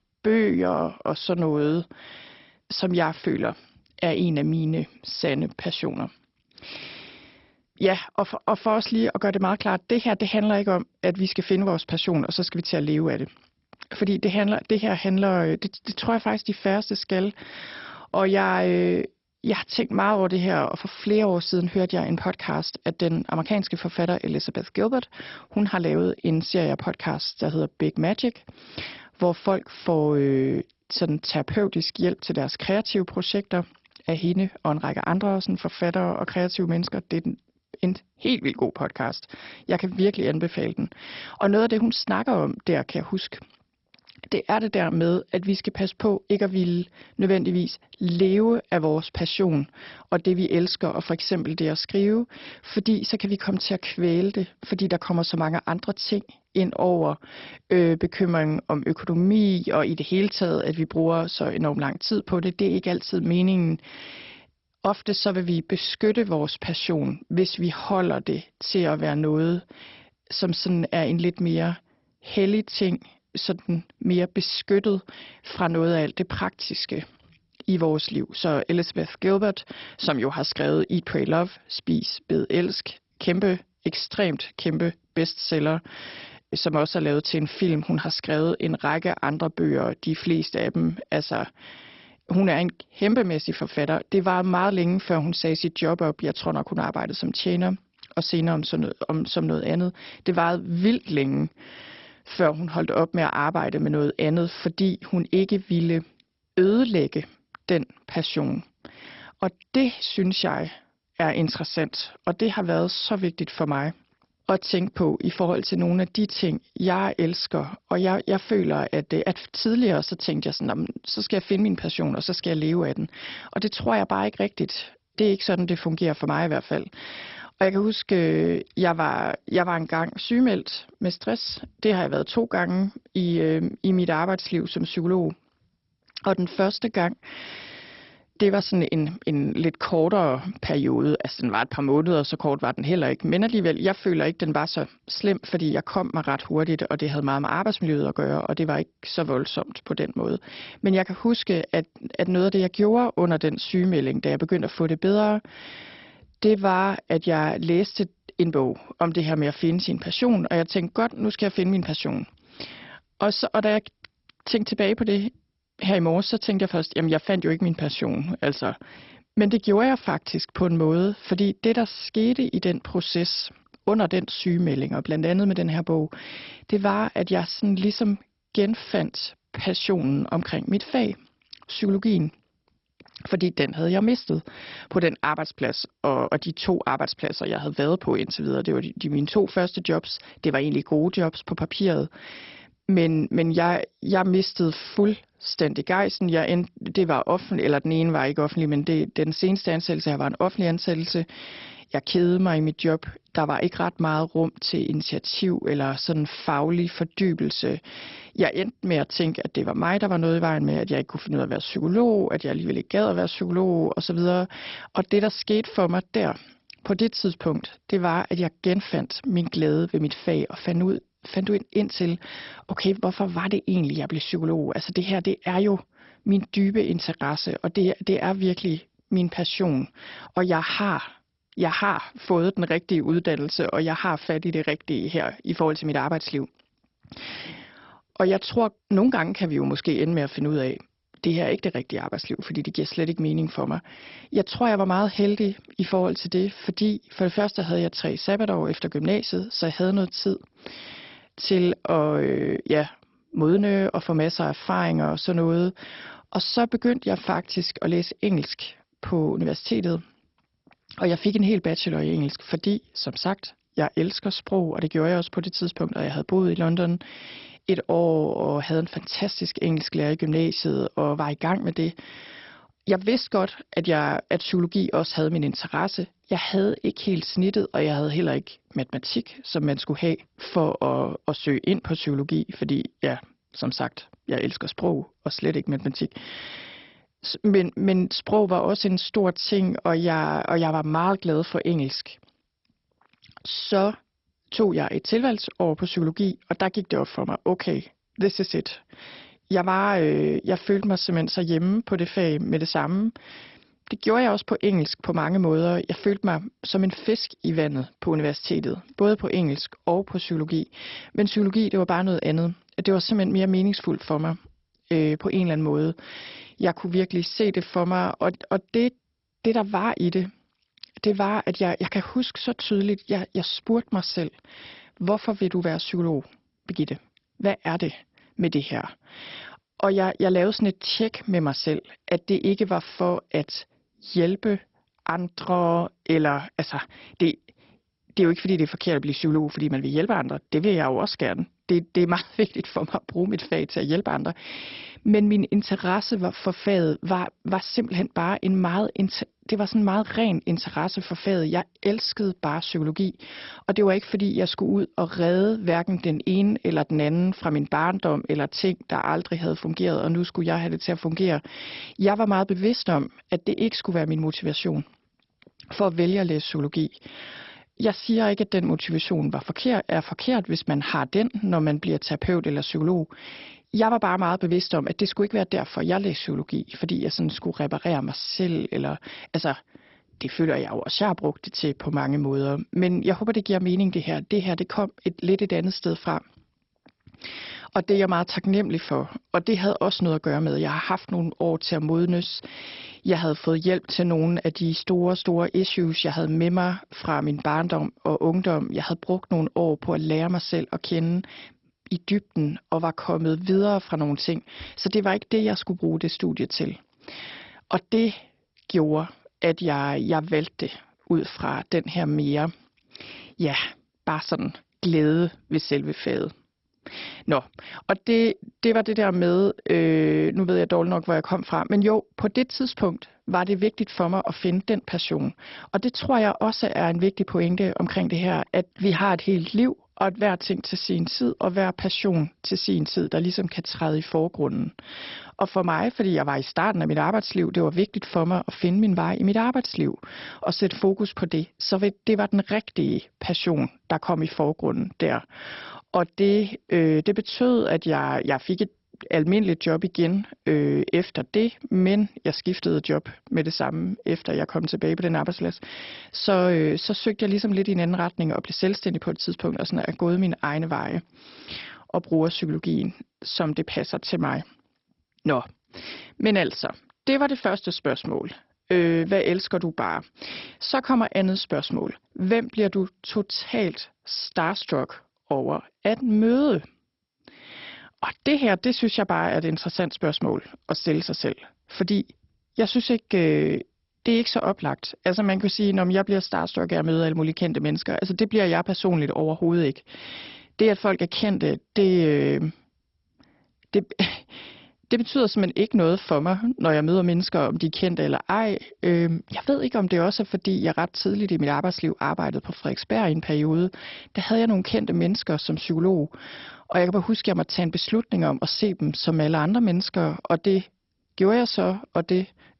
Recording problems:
garbled, watery; badly; nothing above 5.5 kHz

